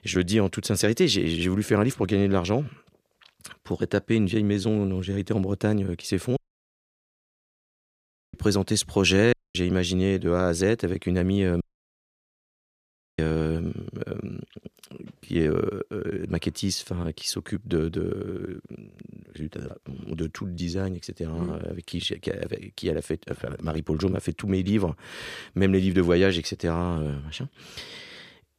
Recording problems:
audio cutting out; at 6.5 s for 2 s, at 9.5 s and at 12 s for 1.5 s

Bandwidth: 14.5 kHz